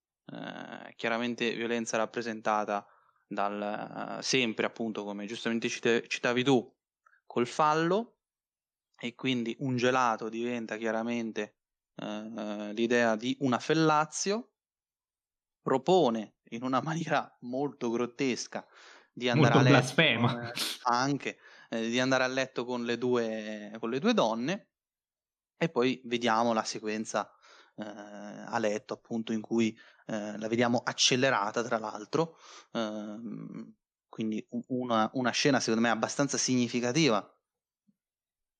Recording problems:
none

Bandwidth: 13 kHz